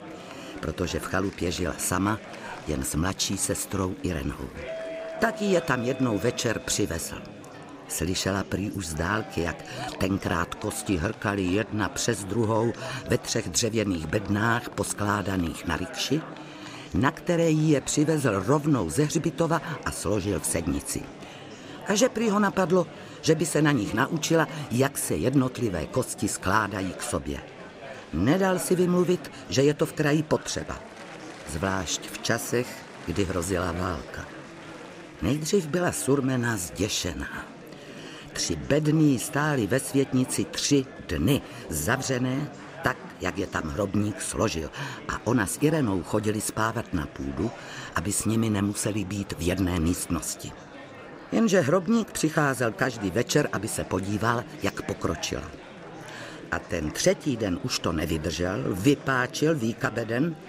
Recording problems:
murmuring crowd; noticeable; throughout; 15 dB below the speech
doorbell; noticeable; from 4.5 to 7 s; peak 9 dB below the speech

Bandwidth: 15.5 kHz